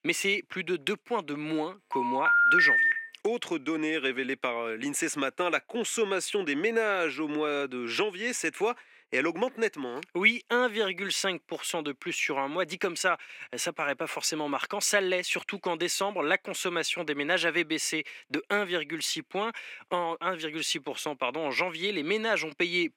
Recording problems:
thin; somewhat; fading below 300 Hz
phone ringing; loud; from 2 to 3 s; peak 10 dB above the speech

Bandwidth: 16.5 kHz